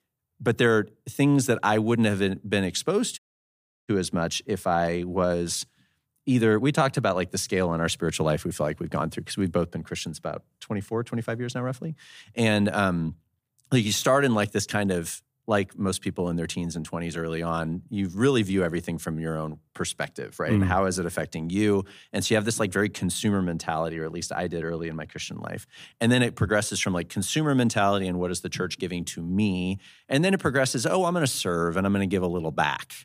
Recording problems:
audio cutting out; at 3 s for 0.5 s

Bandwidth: 15 kHz